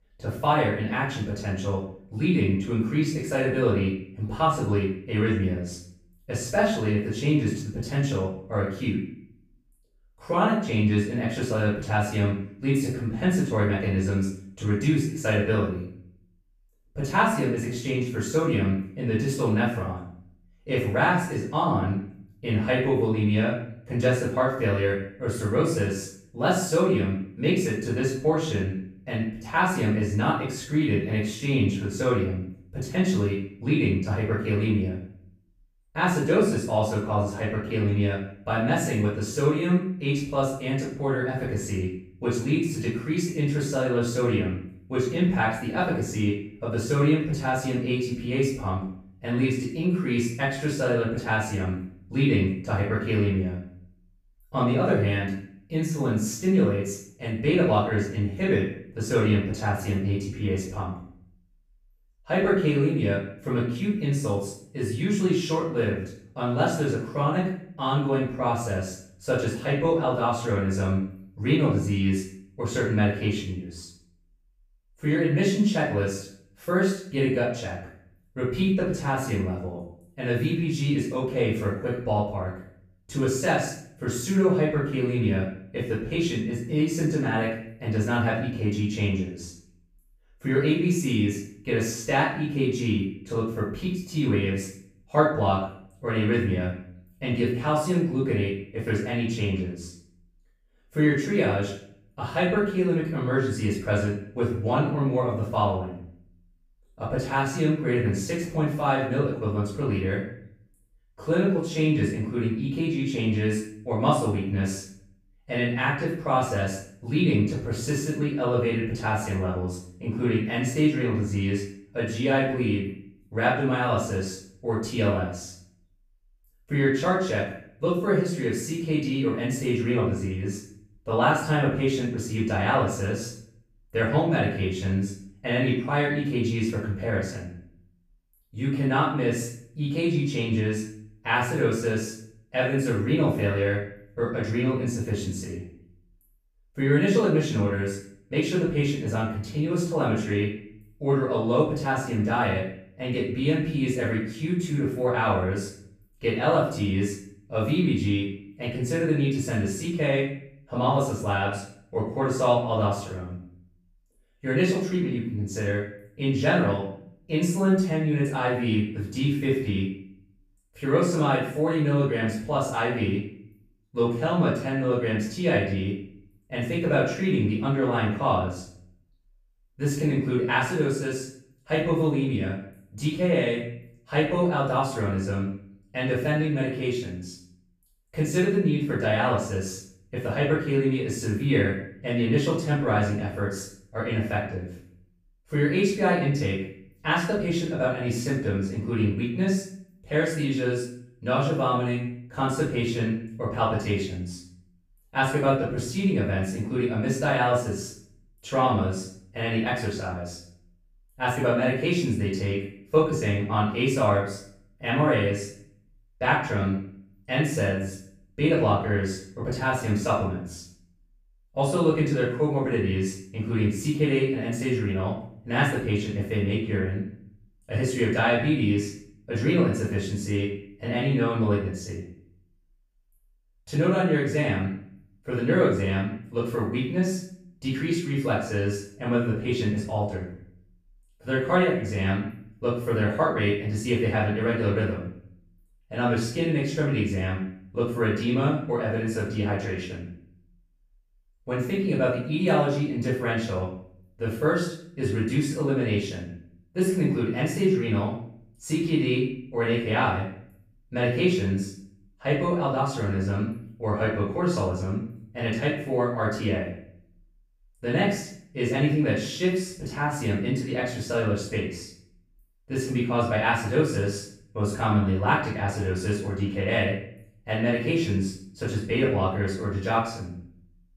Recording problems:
off-mic speech; far
room echo; noticeable; dies away in 0.5 s

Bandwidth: 15 kHz